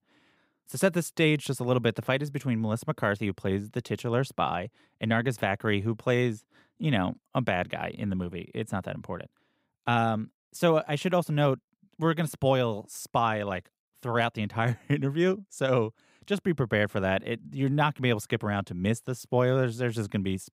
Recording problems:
none

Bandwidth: 15.5 kHz